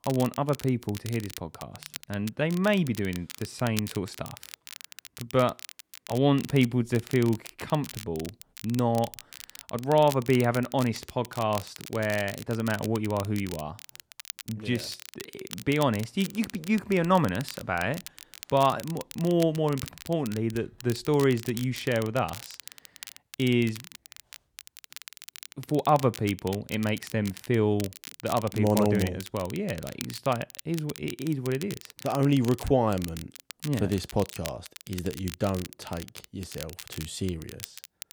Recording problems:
crackle, like an old record; noticeable; 15 dB below the speech

